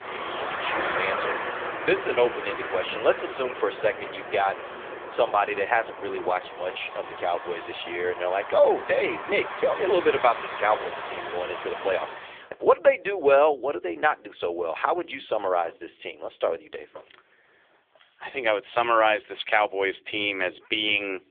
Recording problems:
phone-call audio; poor line; nothing above 3.5 kHz
traffic noise; loud; until 12 s; 8 dB below the speech

